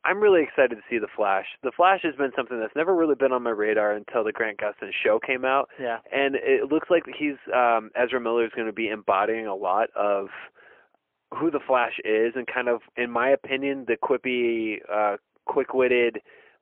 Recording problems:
phone-call audio; poor line; nothing above 3 kHz

